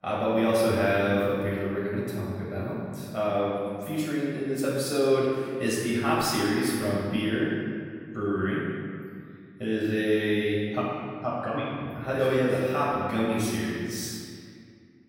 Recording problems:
room echo; strong; dies away in 1.9 s
off-mic speech; far

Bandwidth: 16 kHz